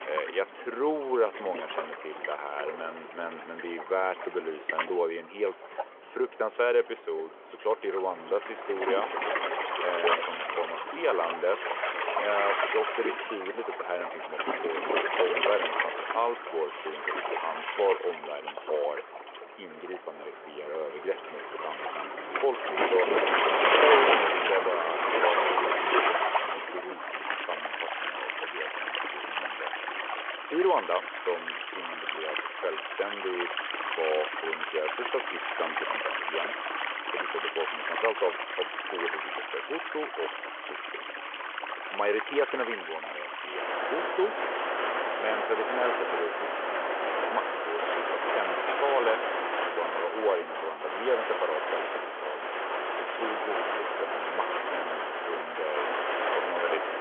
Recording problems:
phone-call audio
rain or running water; very loud; throughout; 2 dB above the speech

